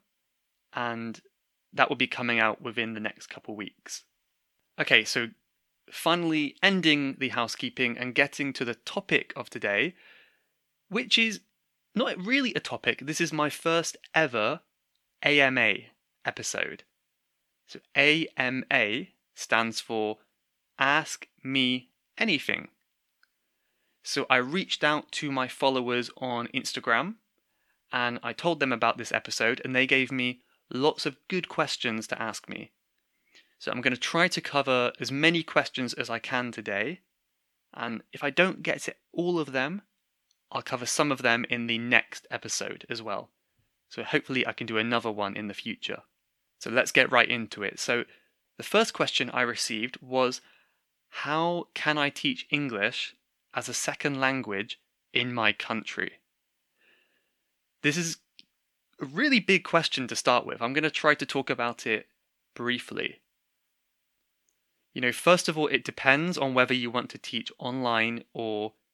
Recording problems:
thin; very slightly; fading below 300 Hz

